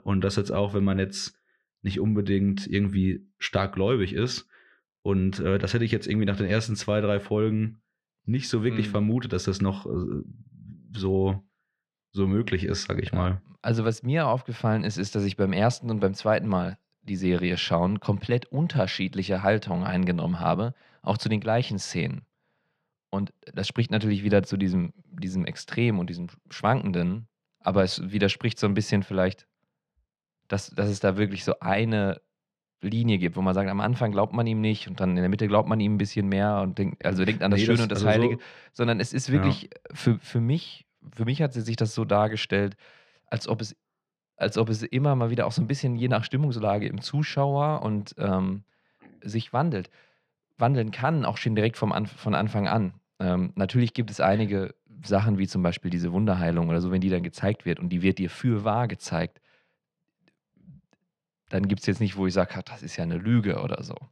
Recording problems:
muffled; slightly; fading above 3 kHz

